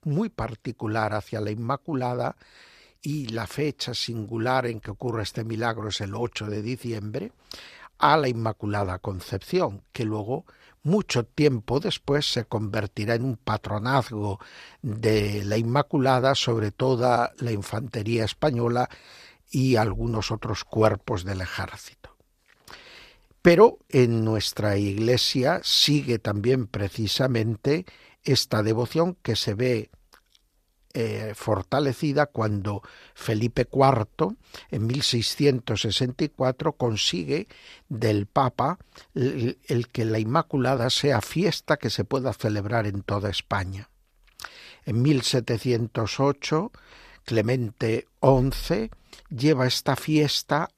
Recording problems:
none

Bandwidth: 14.5 kHz